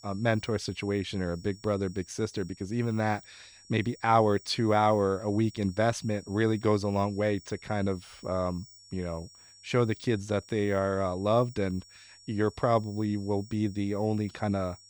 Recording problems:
high-pitched whine; faint; throughout; 5.5 kHz, 25 dB below the speech

